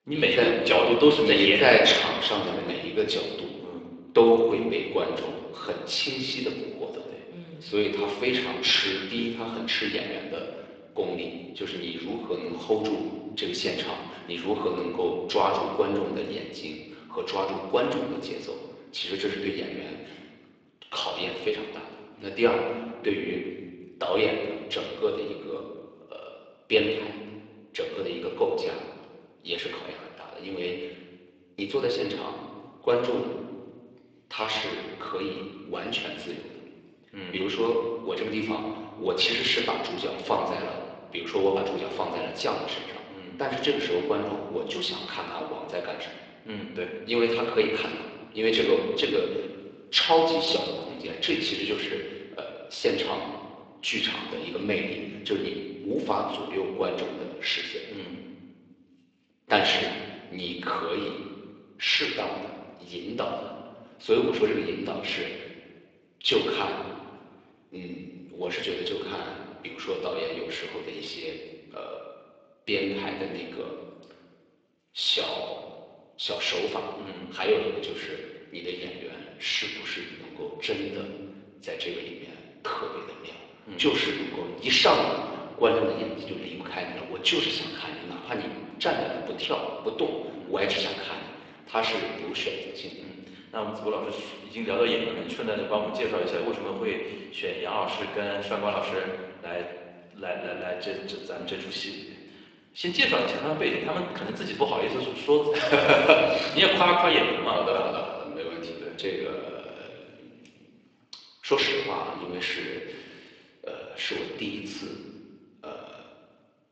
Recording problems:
room echo; noticeable; dies away in 1.3 s
thin; somewhat; fading below 400 Hz
off-mic speech; somewhat distant
garbled, watery; slightly; nothing above 7.5 kHz

